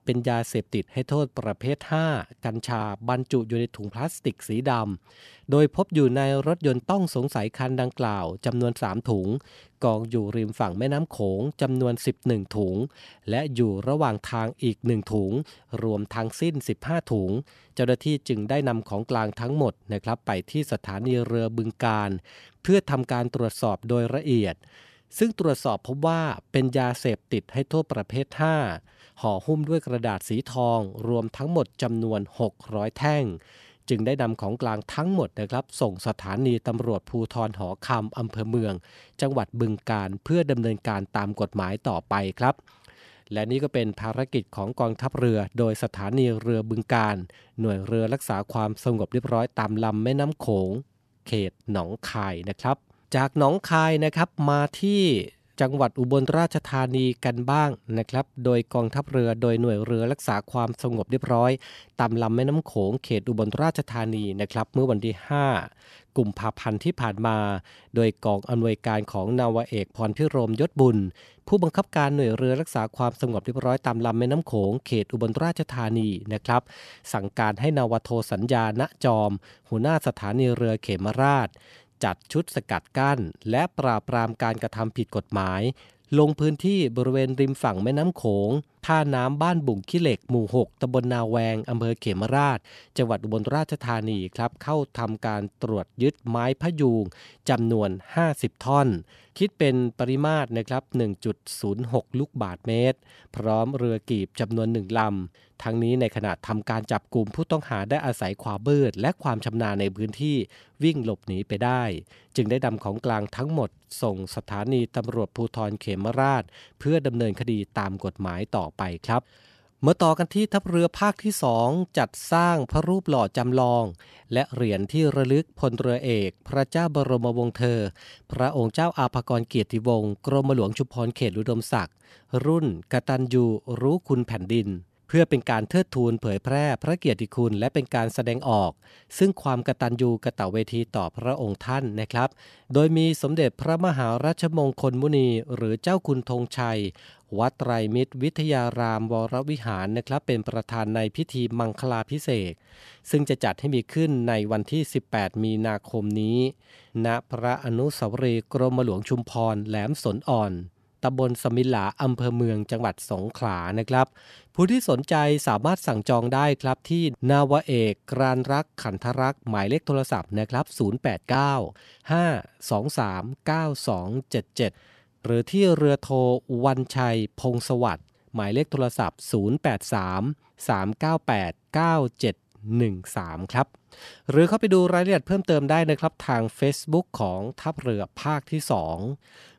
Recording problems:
none

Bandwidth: 13.5 kHz